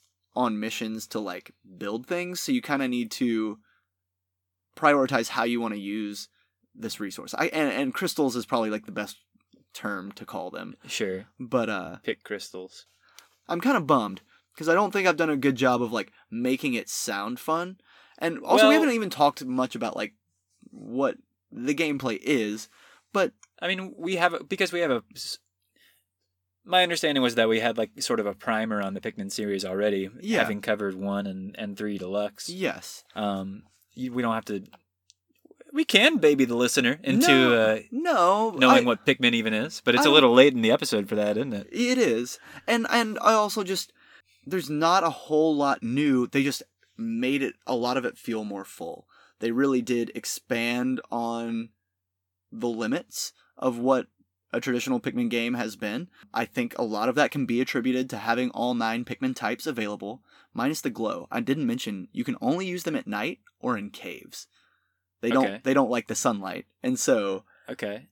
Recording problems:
none

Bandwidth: 18.5 kHz